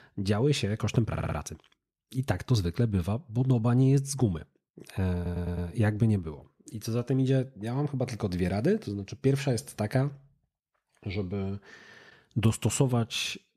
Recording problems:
audio stuttering; at 1 s and at 5 s

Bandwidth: 14.5 kHz